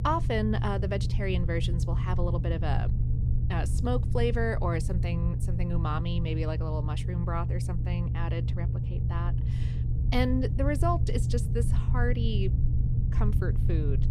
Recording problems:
low rumble; loud; throughout; 8 dB below the speech

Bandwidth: 15 kHz